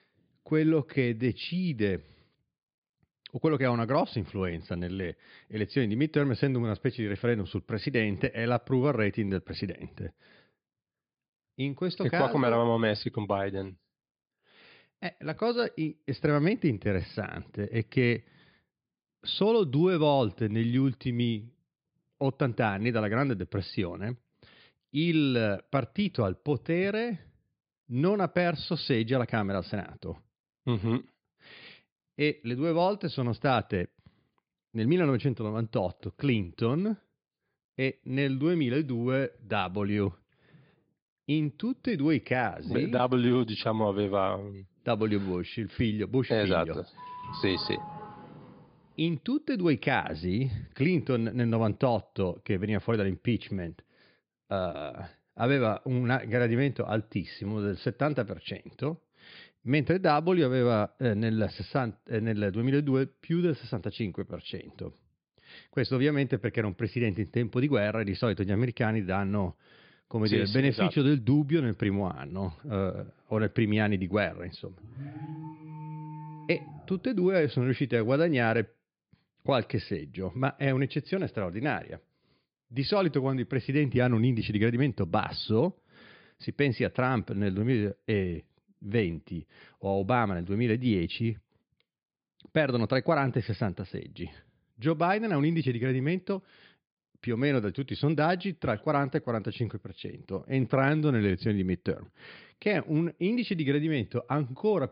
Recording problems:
high frequencies cut off; severe; nothing above 5 kHz
doorbell; faint; from 47 to 49 s; peak 10 dB below the speech
alarm; faint; from 1:15 to 1:17; peak 10 dB below the speech

